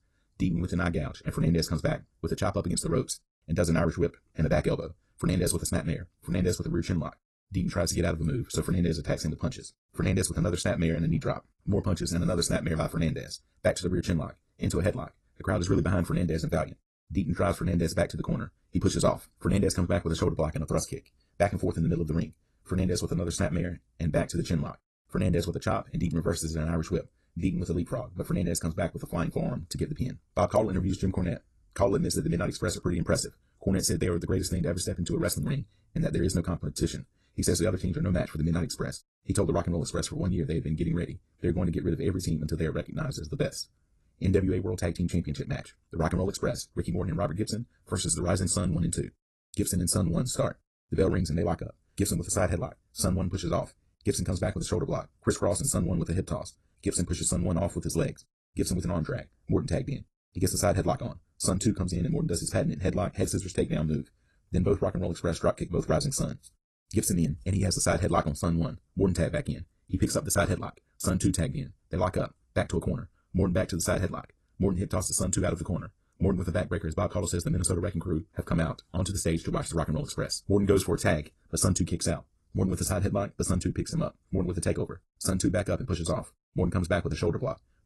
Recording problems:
wrong speed, natural pitch; too fast; 1.6 times normal speed
garbled, watery; slightly; nothing above 11.5 kHz

